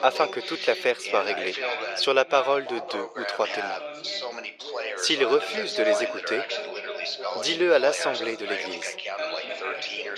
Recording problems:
thin; very; fading below 450 Hz
muffled; very slightly; fading above 3 kHz
background chatter; loud; throughout; 3 voices, 5 dB below the speech

